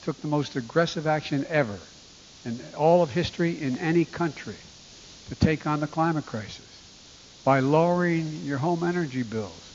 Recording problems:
high frequencies cut off; noticeable; nothing above 7 kHz
hiss; faint; throughout; 20 dB below the speech

